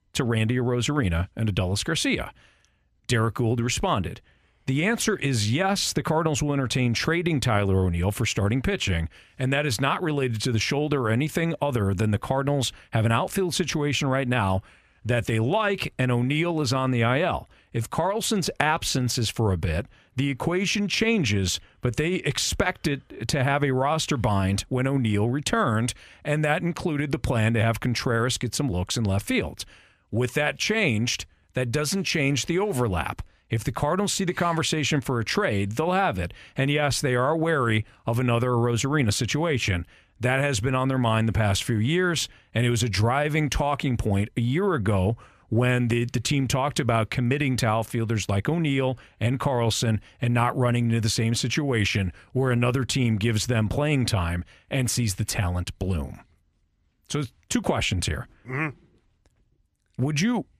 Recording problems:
none

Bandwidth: 14.5 kHz